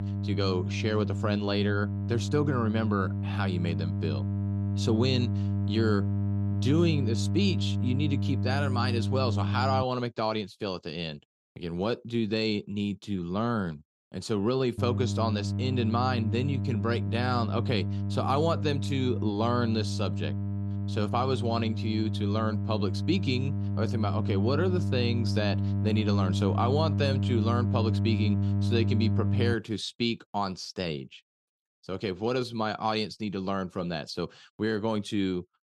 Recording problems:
electrical hum; loud; until 10 s and from 15 to 30 s; 50 Hz, 9 dB below the speech

